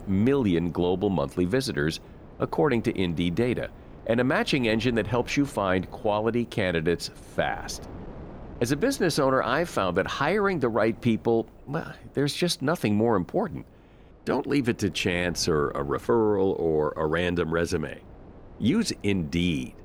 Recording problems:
wind noise on the microphone; occasional gusts; 25 dB below the speech

